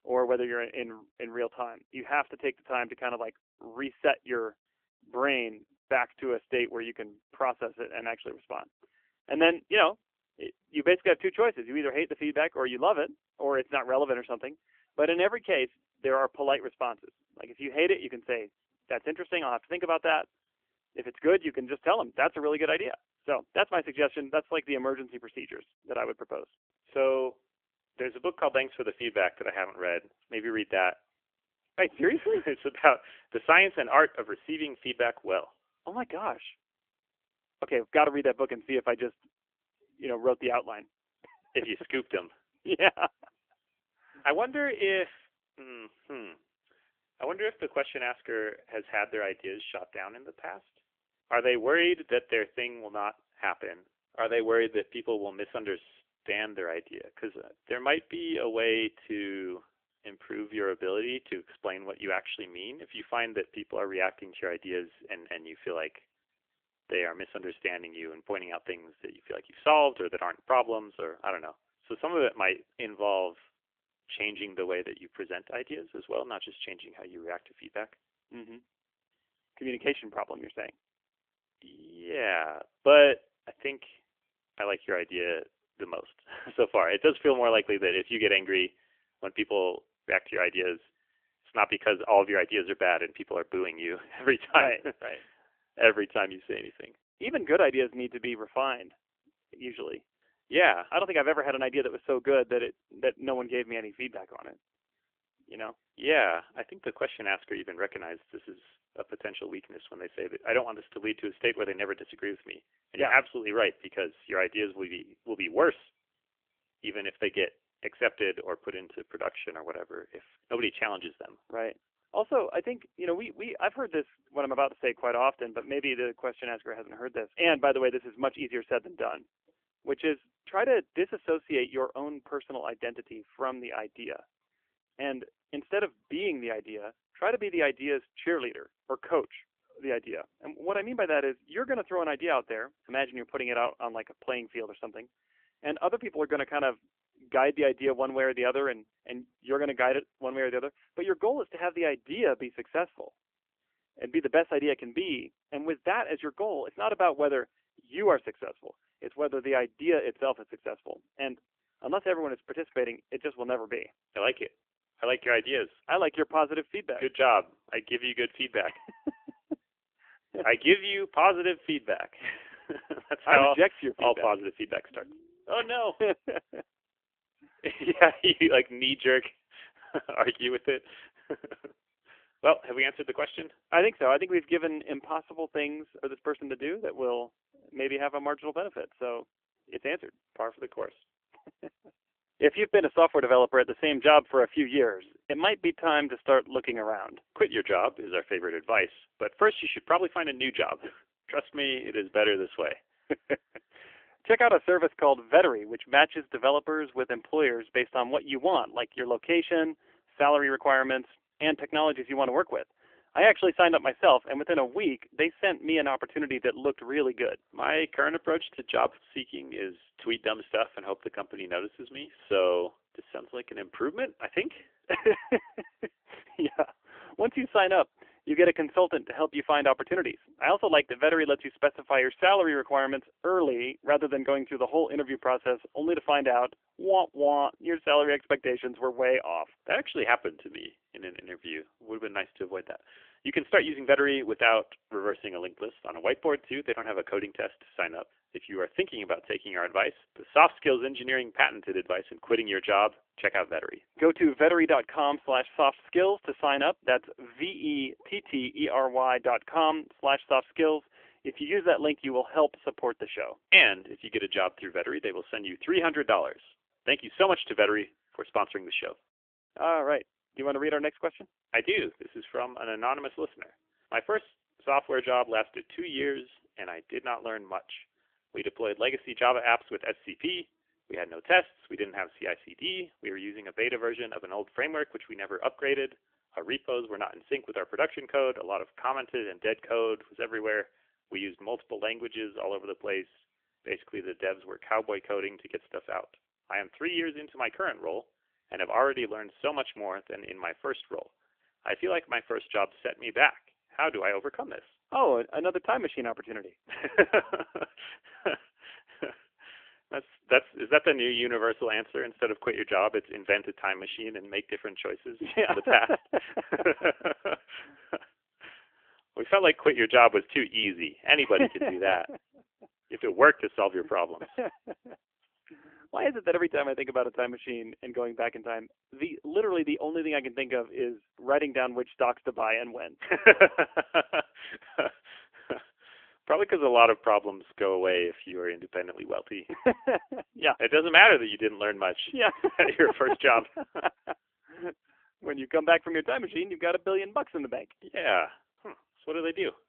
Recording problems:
phone-call audio; nothing above 3 kHz

